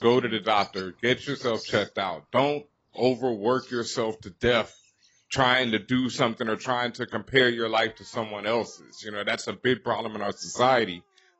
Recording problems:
garbled, watery; badly; nothing above 8 kHz
animal sounds; faint; throughout; 20 dB below the speech

